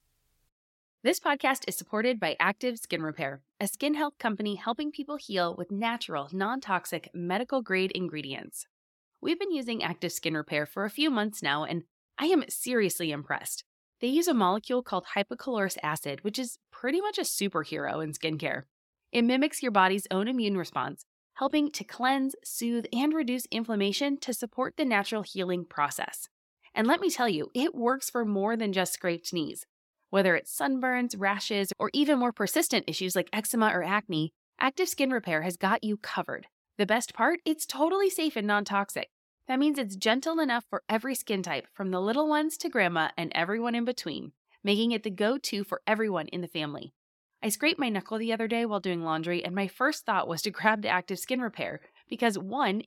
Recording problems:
none

